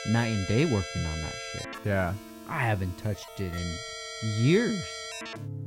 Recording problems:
background music; loud; throughout; 8 dB below the speech

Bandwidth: 16 kHz